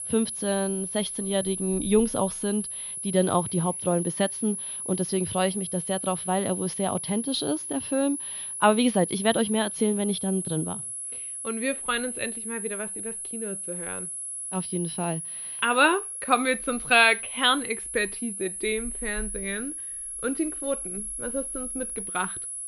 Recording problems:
muffled; slightly; fading above 3.5 kHz
high-pitched whine; loud; throughout; 10.5 kHz, 5 dB below the speech

